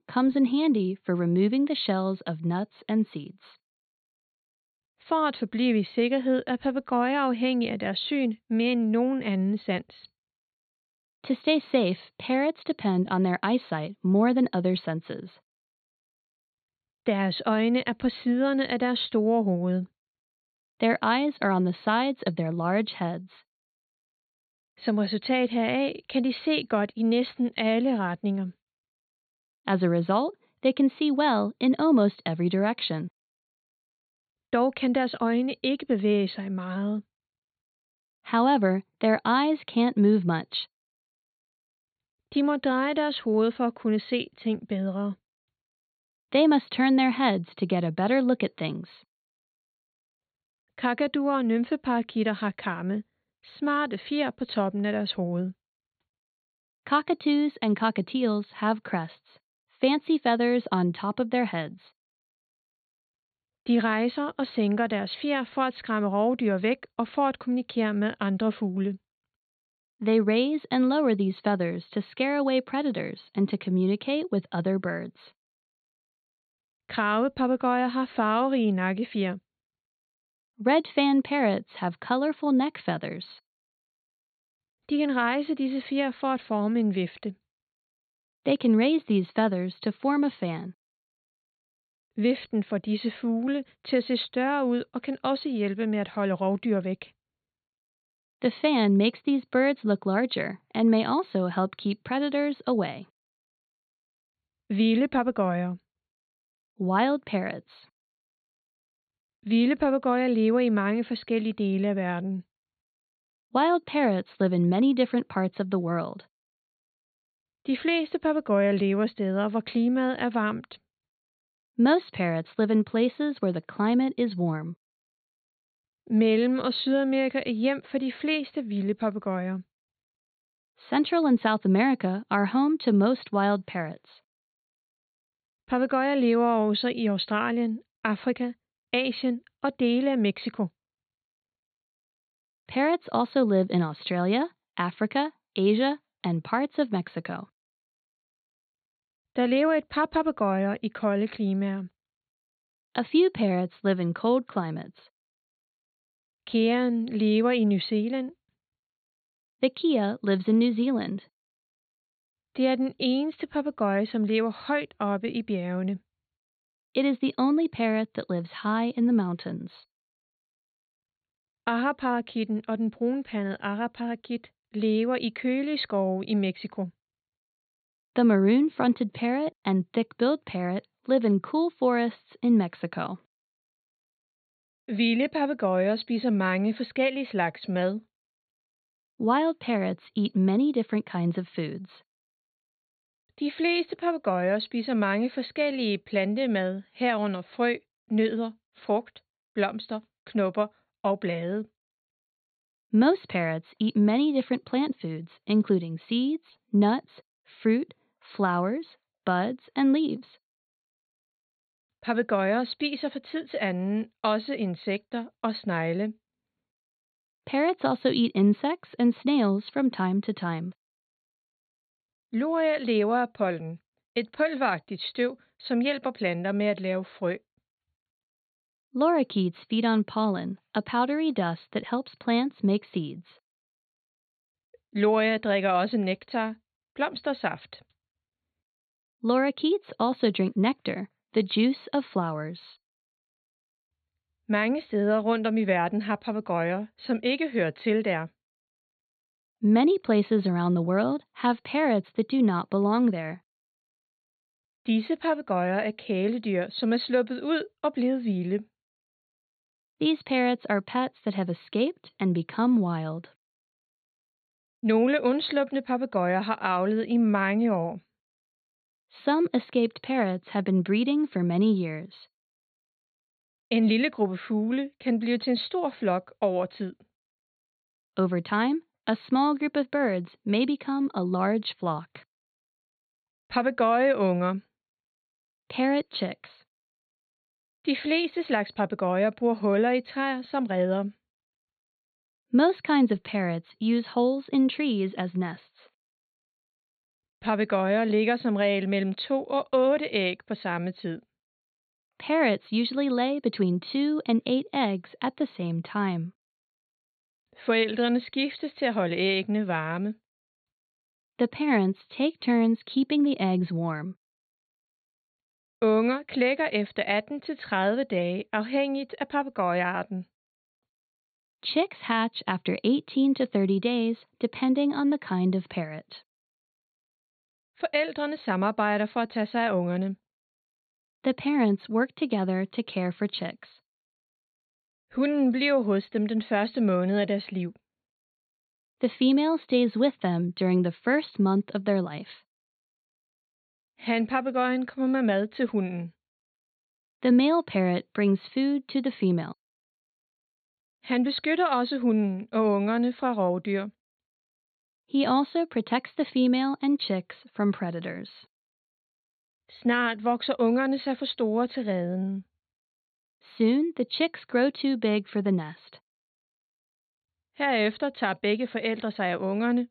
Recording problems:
high frequencies cut off; severe; nothing above 4.5 kHz

